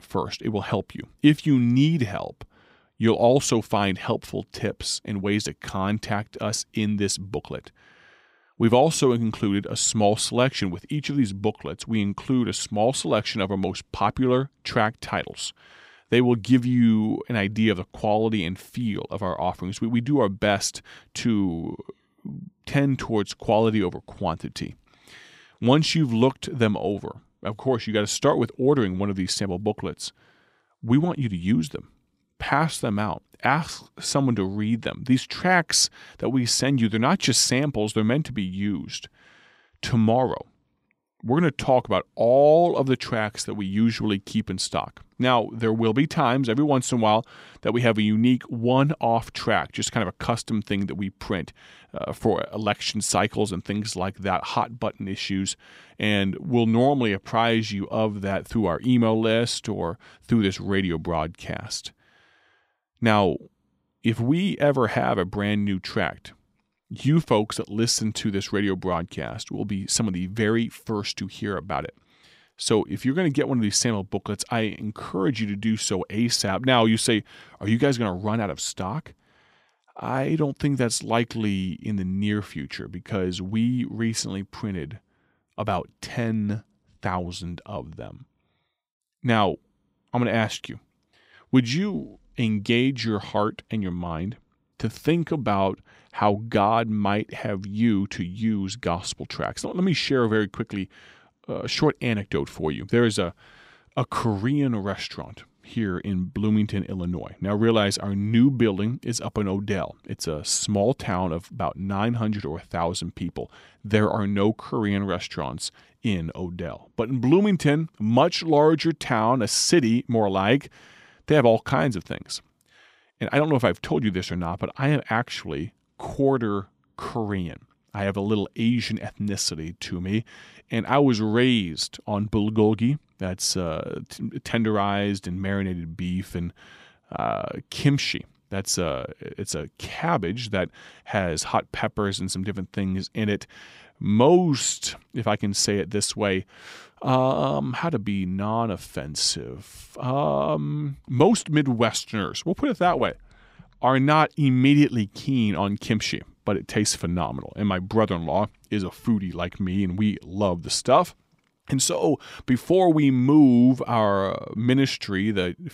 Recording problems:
none

